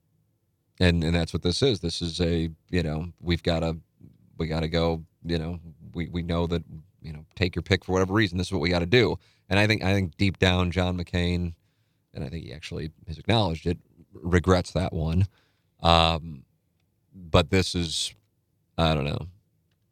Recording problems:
none

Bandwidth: 18.5 kHz